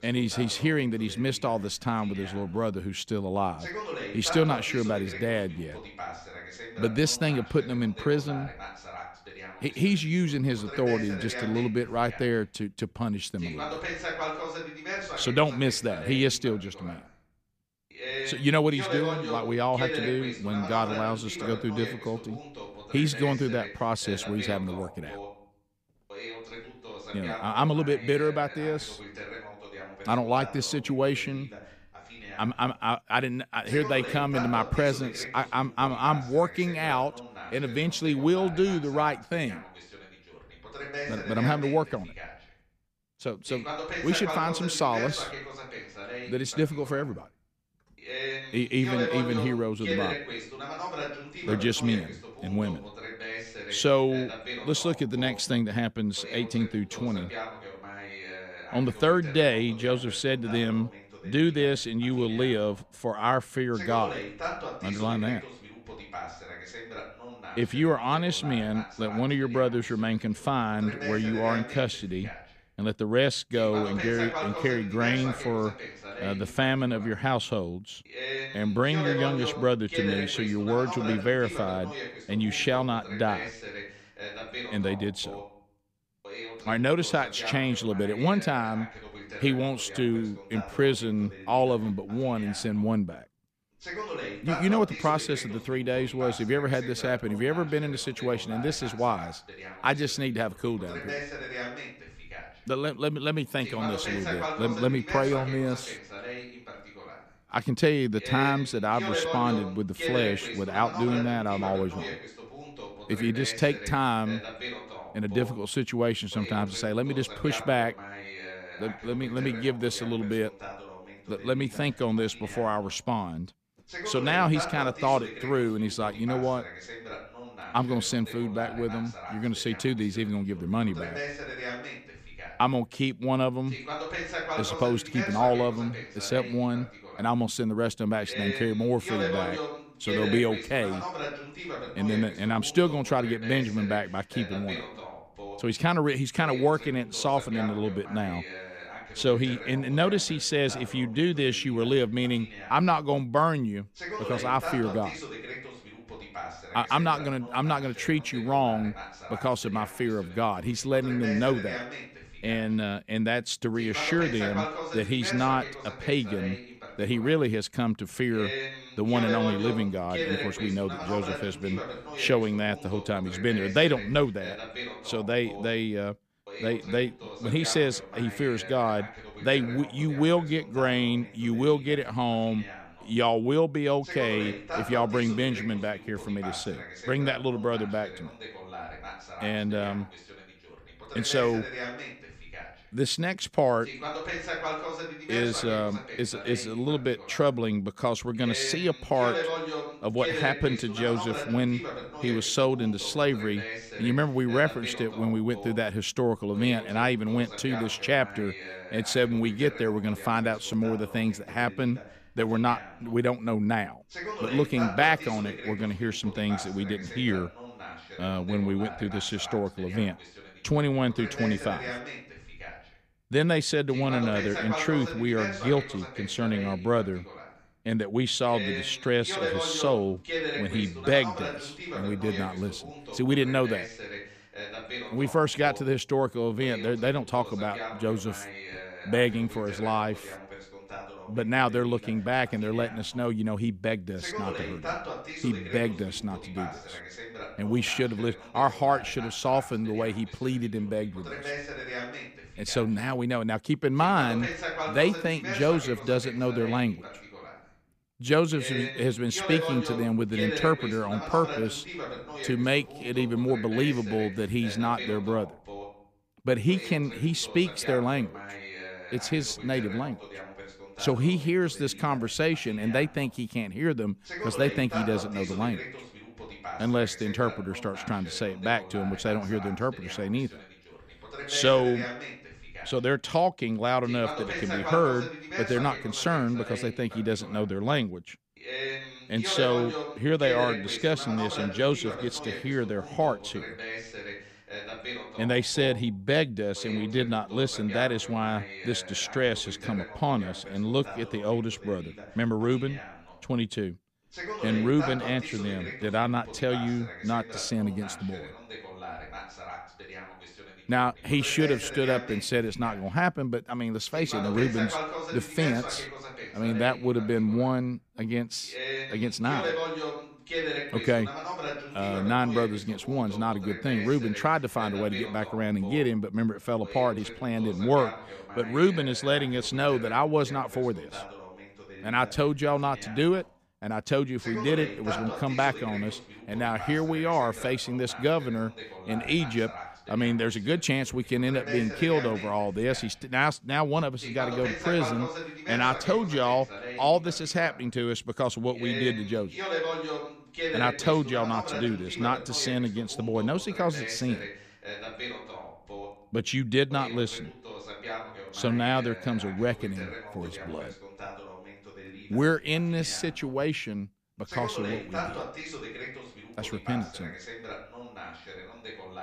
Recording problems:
voice in the background; loud; throughout; 10 dB below the speech

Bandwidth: 15 kHz